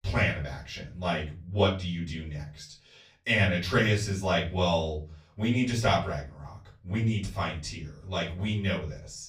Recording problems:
off-mic speech; far
room echo; slight; dies away in 0.4 s

